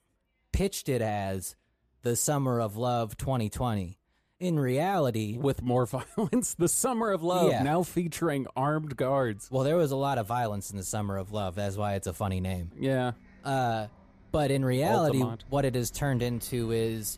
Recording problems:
traffic noise; faint; throughout; 25 dB below the speech

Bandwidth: 14.5 kHz